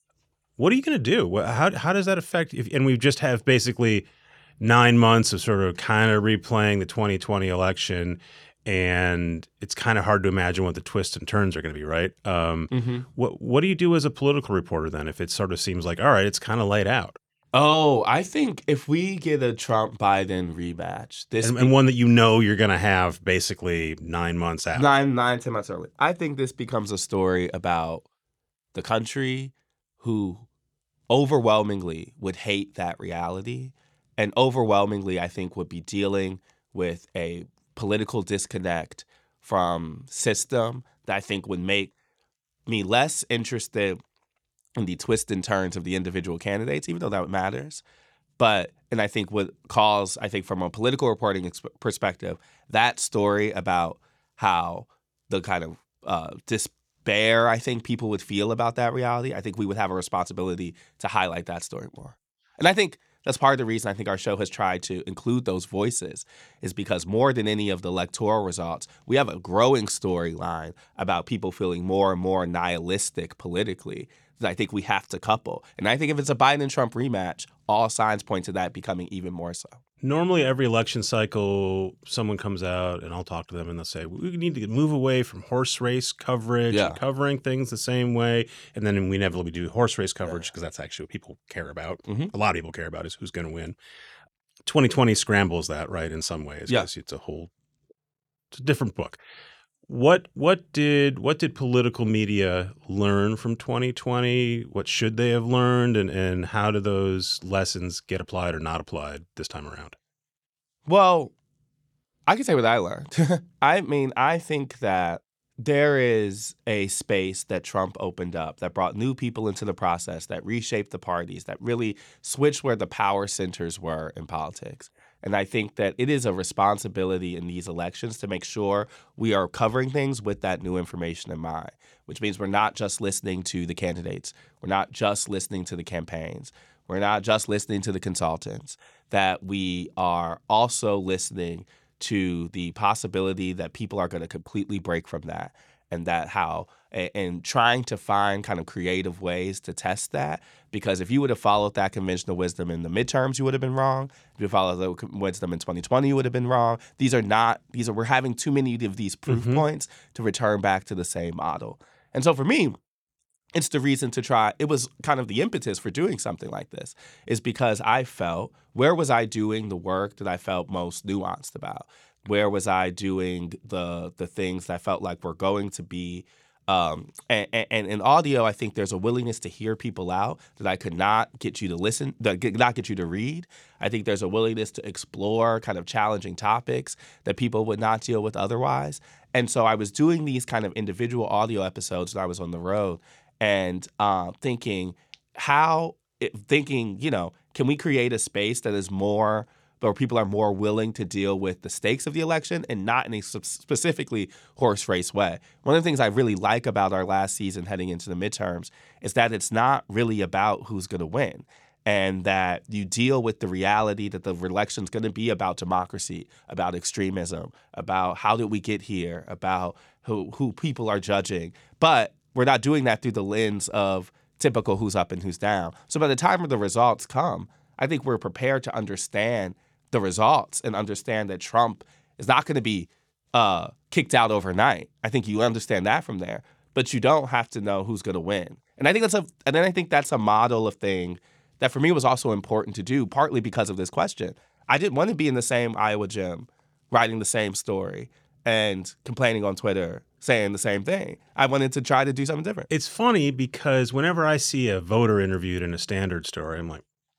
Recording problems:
none

